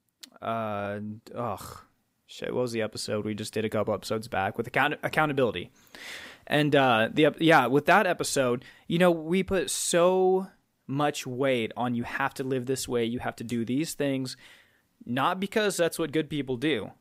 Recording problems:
none

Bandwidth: 15.5 kHz